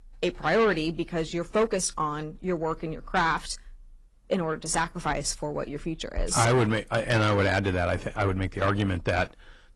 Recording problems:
distortion; slight; 10 dB below the speech
garbled, watery; slightly

